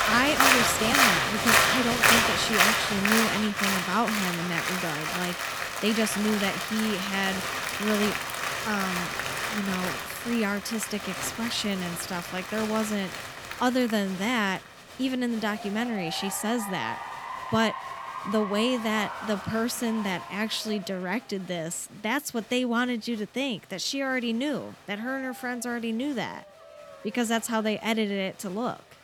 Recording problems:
crowd noise; very loud; throughout; 2 dB above the speech

